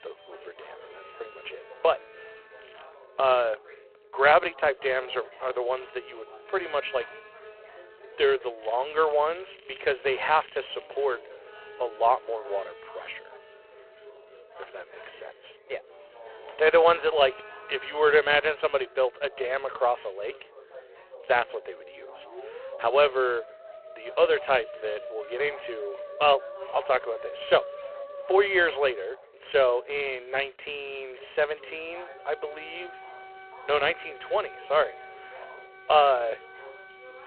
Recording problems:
phone-call audio; poor line
background music; noticeable; throughout; 20 dB below the speech
background chatter; faint; throughout; 3 voices, 25 dB below the speech
crackling; faint; at 2.5 s and from 8.5 to 11 s; 25 dB below the speech

